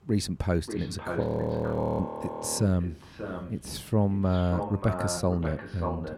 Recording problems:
echo of what is said; strong; throughout; 590 ms later, 8 dB below the speech
traffic noise; faint; throughout; 30 dB below the speech
audio freezing; at 1 s for 1 s

